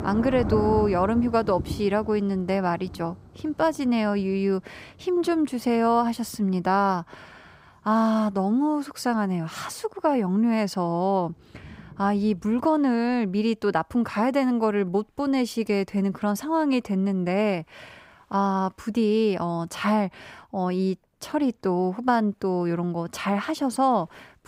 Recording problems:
rain or running water; noticeable; throughout; 10 dB below the speech

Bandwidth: 15.5 kHz